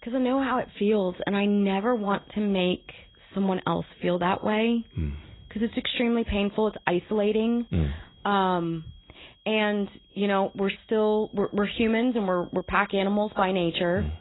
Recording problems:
garbled, watery; badly; nothing above 4 kHz
high-pitched whine; faint; throughout; 3.5 kHz, 30 dB below the speech

